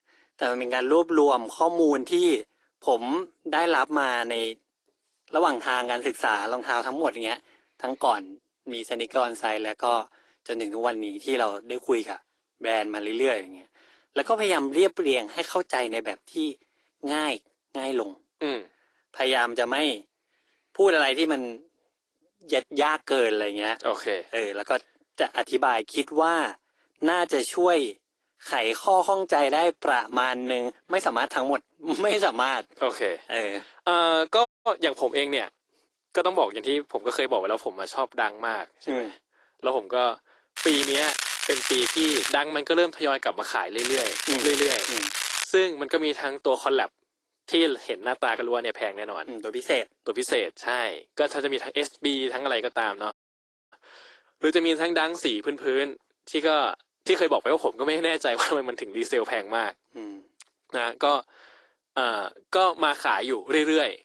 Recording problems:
thin; somewhat; fading below 300 Hz
garbled, watery; slightly; nothing above 15.5 kHz
crackling; loud; from 41 to 42 s and from 44 to 45 s; 1 dB below the speech
audio cutting out; at 34 s and at 53 s for 0.5 s

